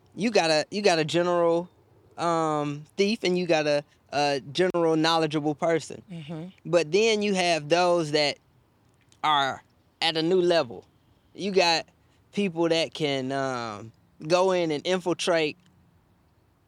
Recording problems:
none

